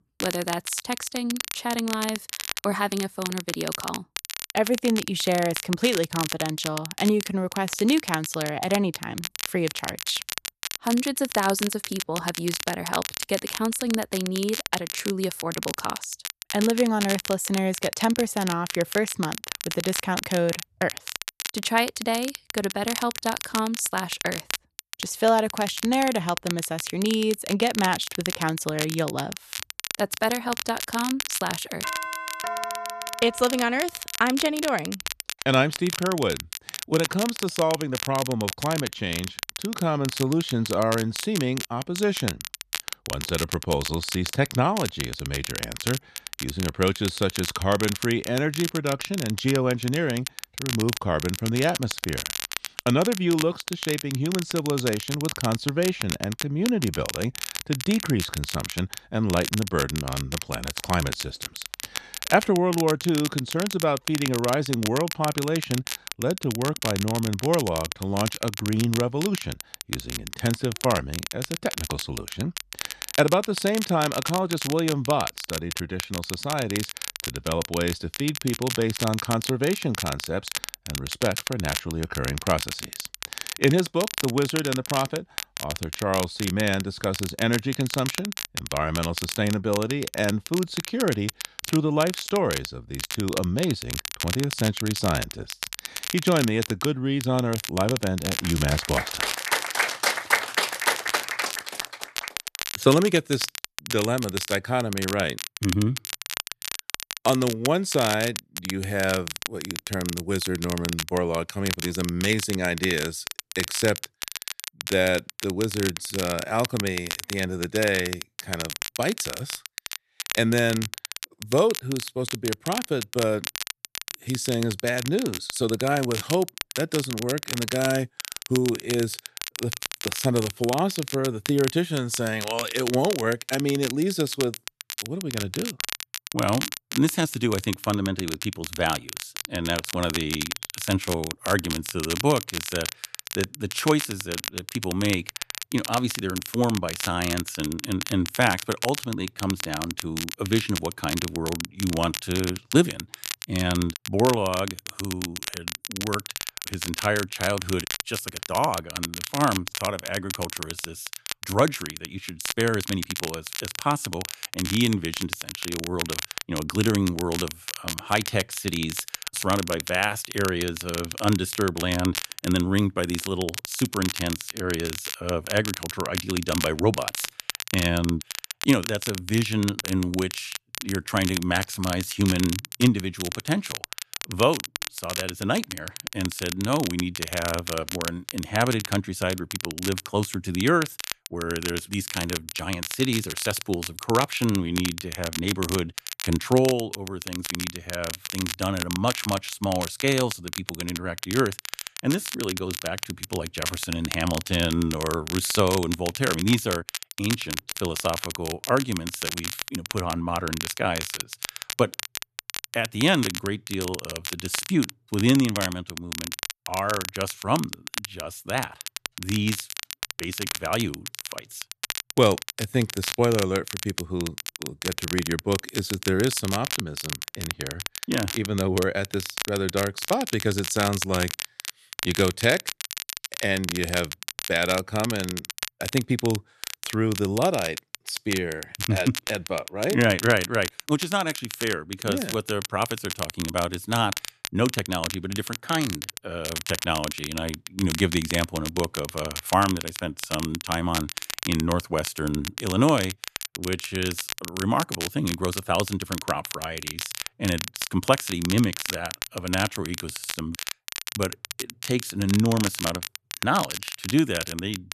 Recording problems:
crackle, like an old record; loud; 6 dB below the speech
doorbell; noticeable; from 32 to 34 s; peak 4 dB below the speech

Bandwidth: 13.5 kHz